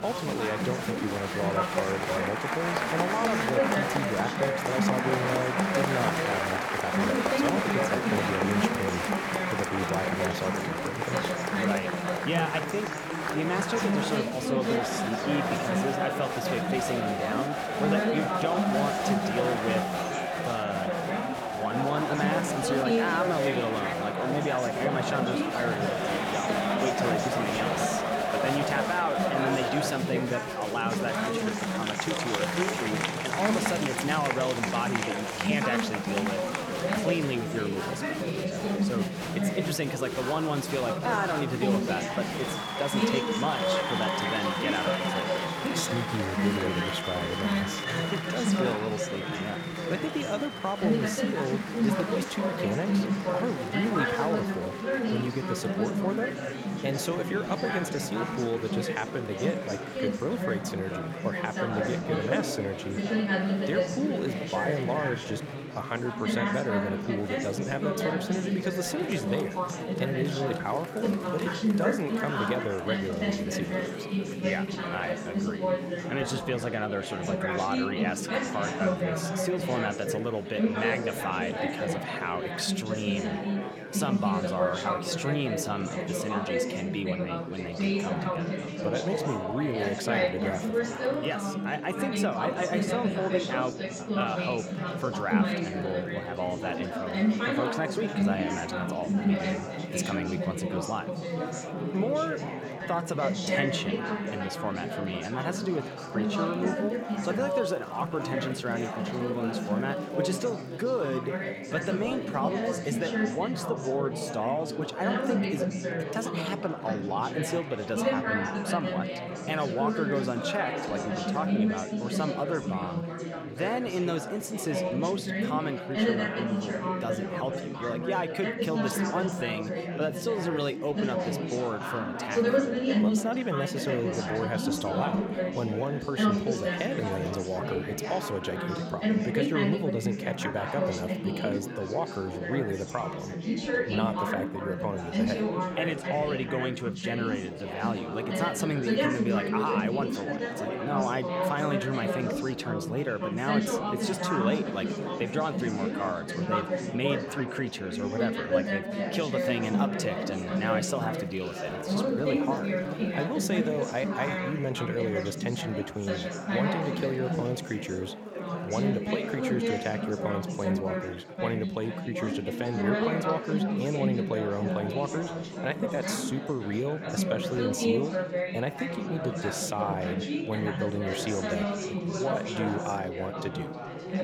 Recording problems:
chatter from many people; very loud; throughout; 2 dB above the speech

